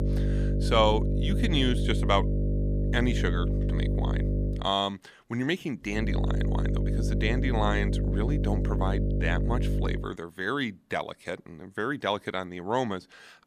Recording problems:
electrical hum; loud; until 4.5 s and from 6 to 10 s; 50 Hz, 7 dB below the speech

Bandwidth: 15 kHz